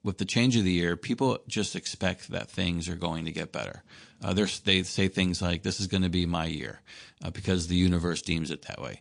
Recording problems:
garbled, watery; slightly

